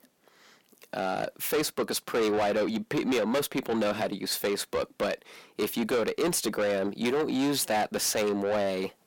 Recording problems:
distortion; heavy; 7 dB below the speech

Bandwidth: 17 kHz